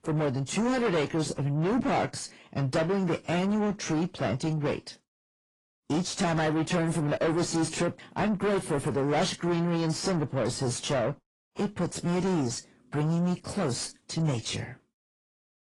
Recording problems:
distortion; heavy; 7 dB below the speech
garbled, watery; slightly

